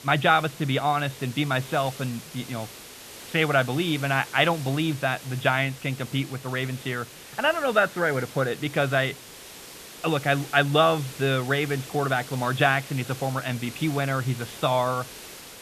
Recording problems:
high frequencies cut off; severe; nothing above 4 kHz
hiss; noticeable; throughout; 15 dB below the speech

